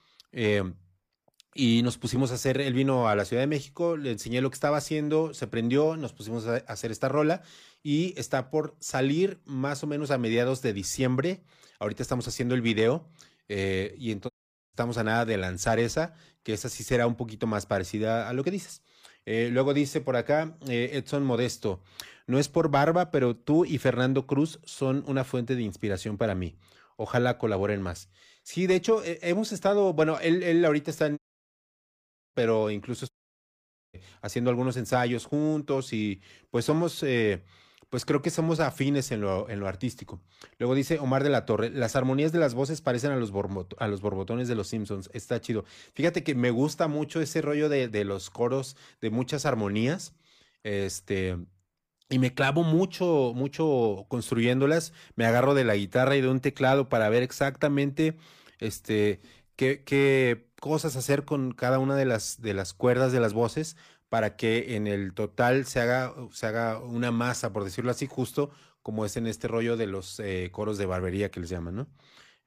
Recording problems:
audio cutting out; at 14 s, at 31 s for 1 s and at 33 s for 1 s

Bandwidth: 15 kHz